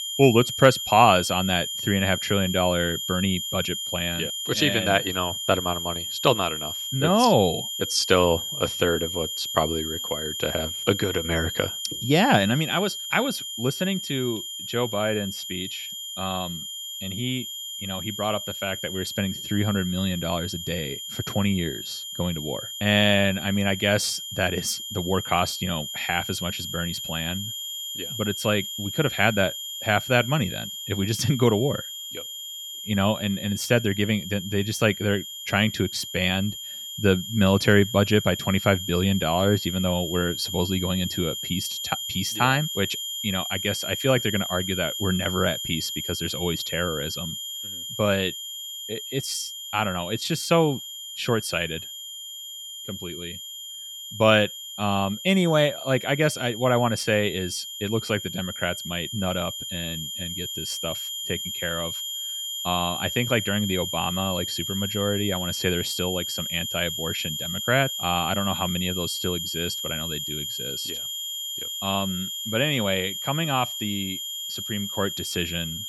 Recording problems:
high-pitched whine; loud; throughout; 3 kHz, 5 dB below the speech

